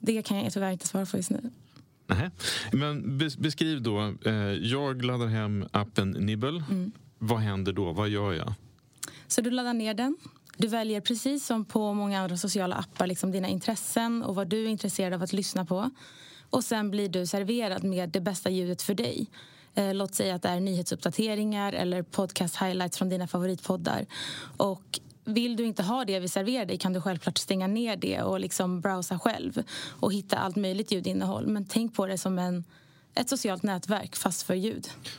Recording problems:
squashed, flat; somewhat

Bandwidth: 16 kHz